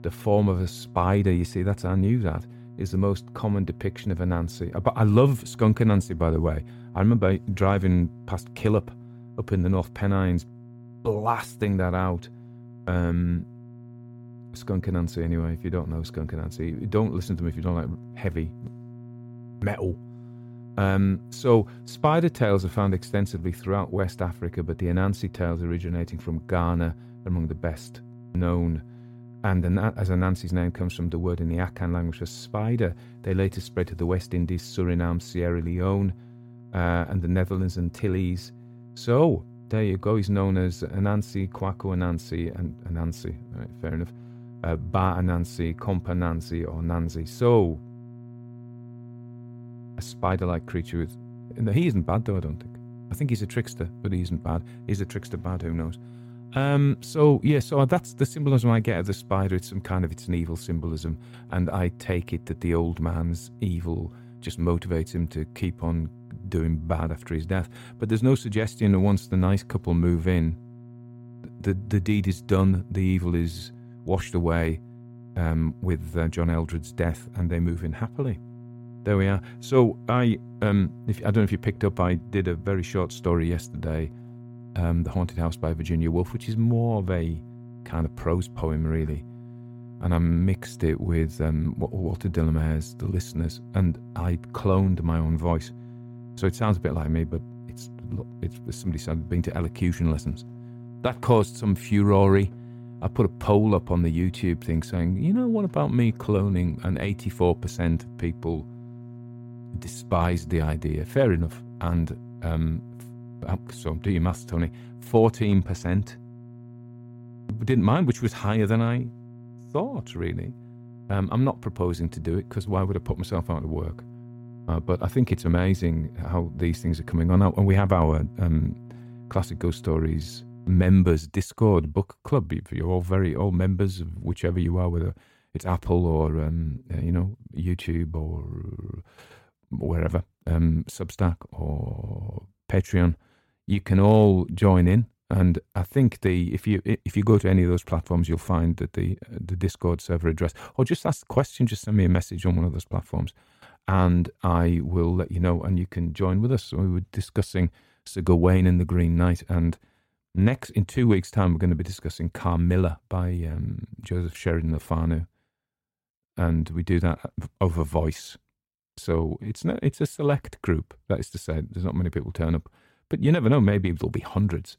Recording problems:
electrical hum; faint; until 2:11; 60 Hz, 20 dB below the speech

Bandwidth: 16.5 kHz